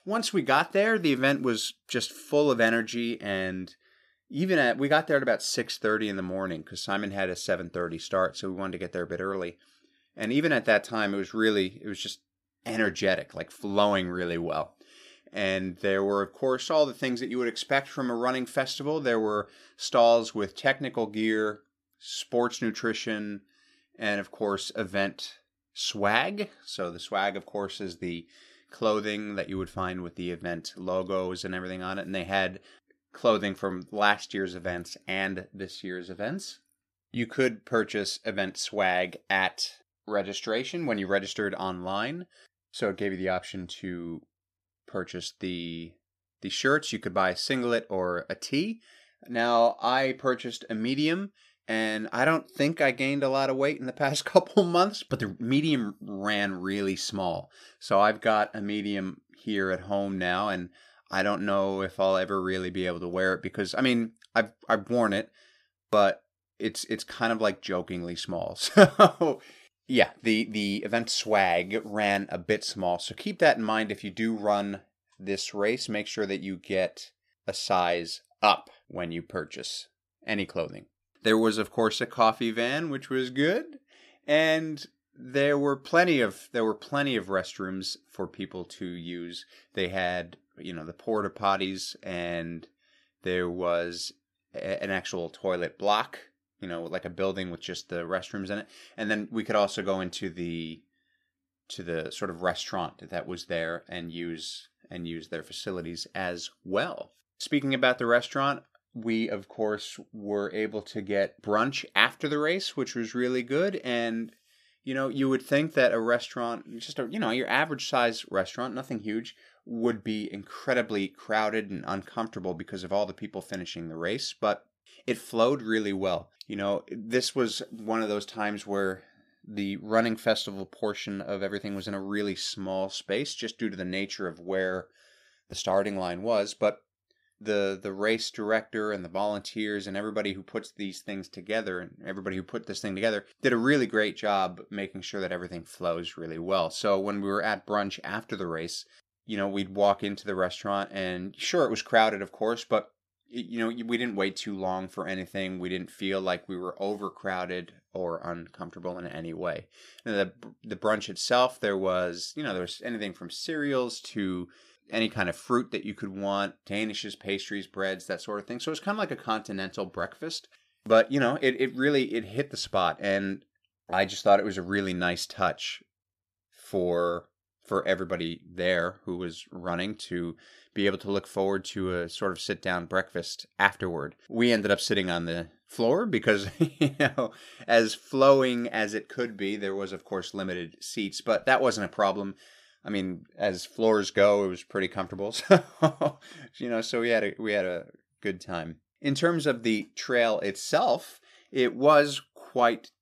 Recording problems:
none

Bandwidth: 14.5 kHz